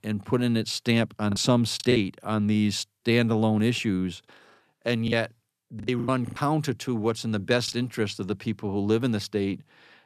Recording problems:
choppy; very; at 1.5 s and from 5 to 6.5 s; 7% of the speech affected

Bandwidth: 14.5 kHz